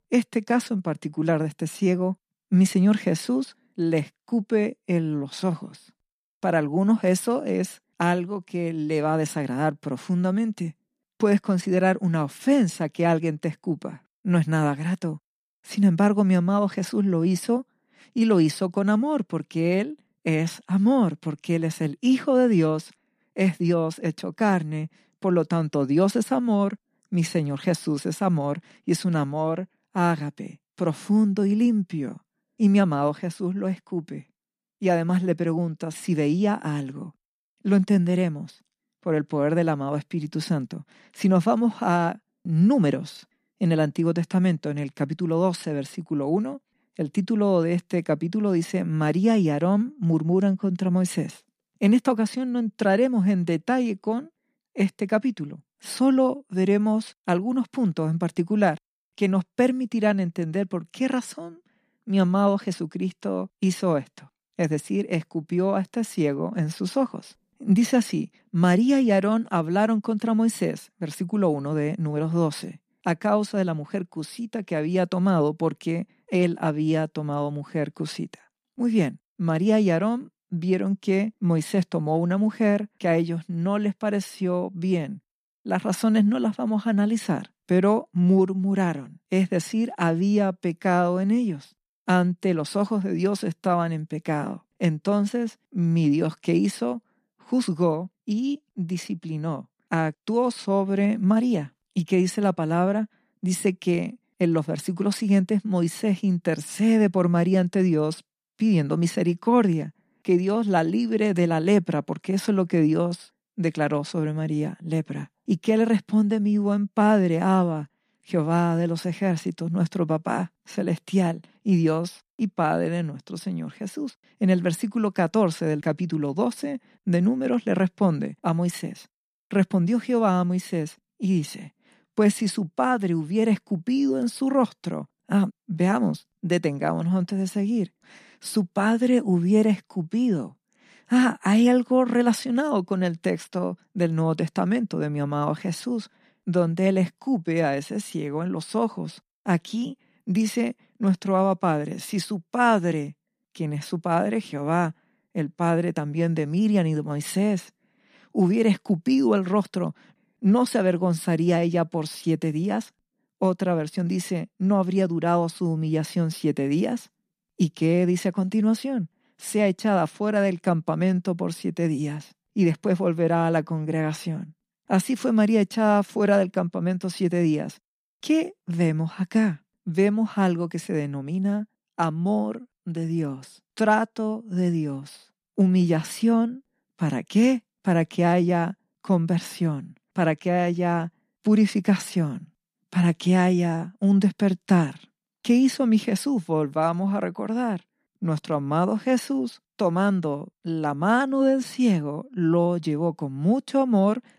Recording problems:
none

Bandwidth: 14.5 kHz